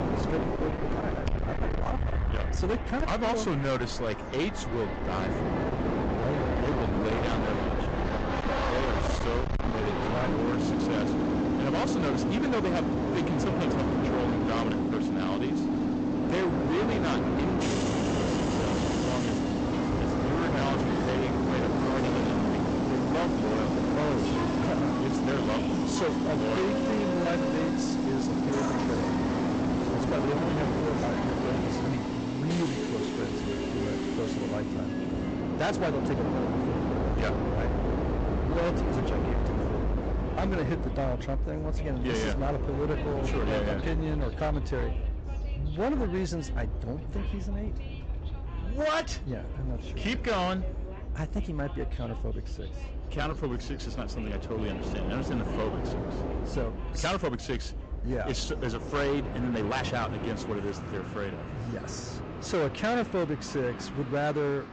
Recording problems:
distortion; heavy; 23% of the sound clipped
high frequencies cut off; noticeable; nothing above 8 kHz
garbled, watery; slightly
train or aircraft noise; very loud; throughout; 2 dB above the speech
voice in the background; faint; throughout; 20 dB below the speech
uneven, jittery; strongly; from 6 s to 1:00

